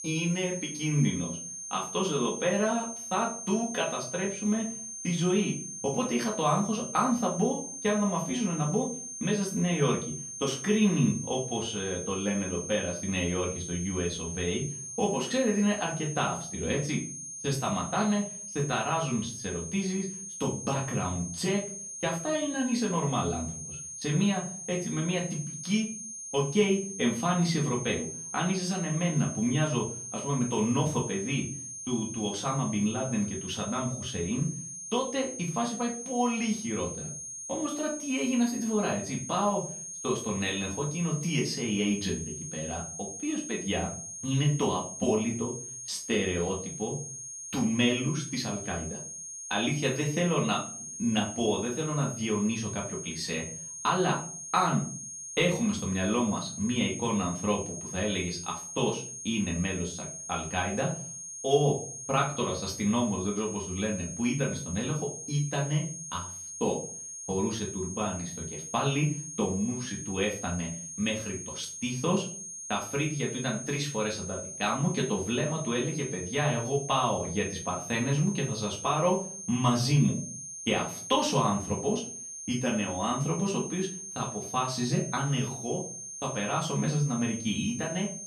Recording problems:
off-mic speech; far
room echo; slight; dies away in 0.4 s
high-pitched whine; loud; throughout; 6.5 kHz, 7 dB below the speech

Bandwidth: 13.5 kHz